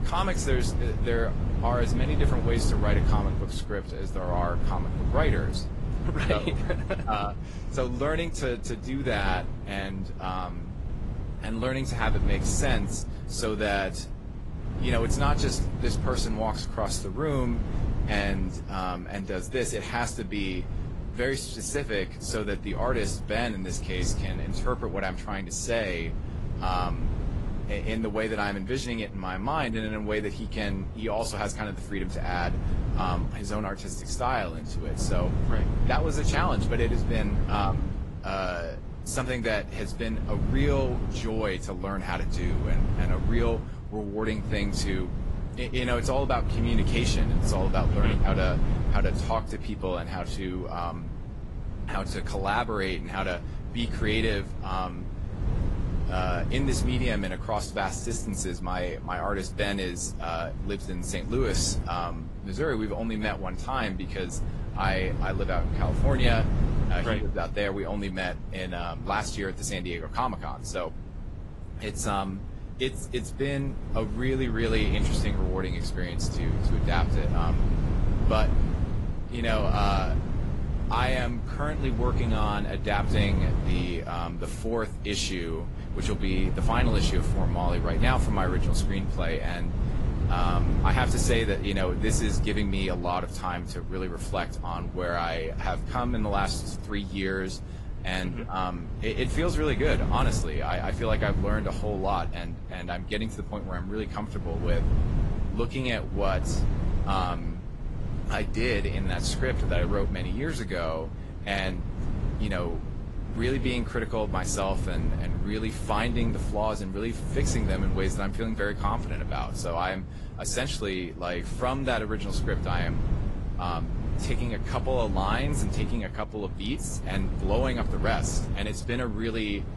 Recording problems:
garbled, watery; slightly; nothing above 11.5 kHz
wind noise on the microphone; occasional gusts; 10 dB below the speech

